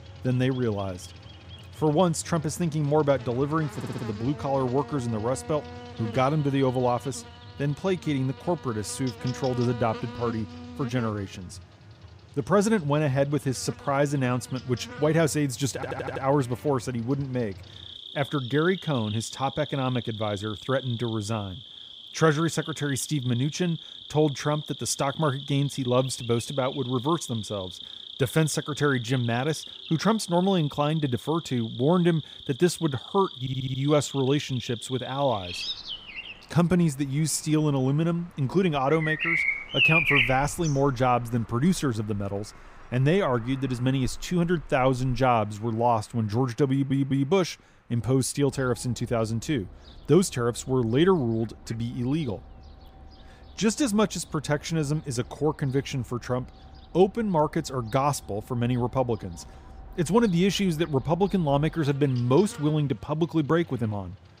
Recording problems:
animal sounds; loud; throughout; 8 dB below the speech
audio stuttering; 4 times, first at 4 s

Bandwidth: 15.5 kHz